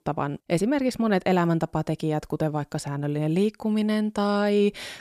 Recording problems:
none

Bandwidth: 14.5 kHz